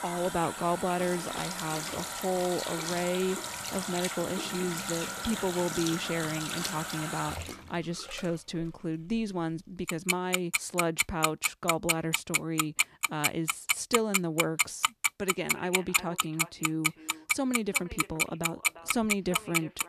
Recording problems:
echo of what is said; noticeable; from 15 s on; 350 ms later, 15 dB below the speech
household noises; very loud; throughout; 2 dB above the speech

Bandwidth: 14.5 kHz